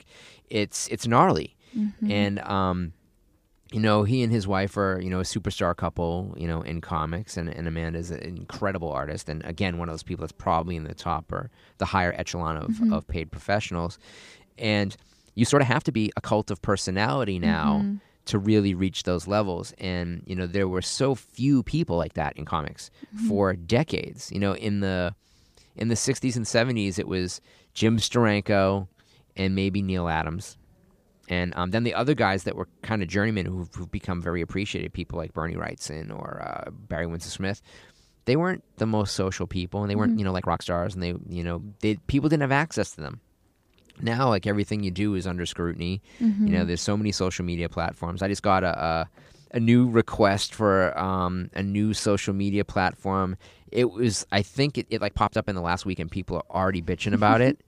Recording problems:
uneven, jittery; strongly; from 1.5 to 56 s

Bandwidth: 15 kHz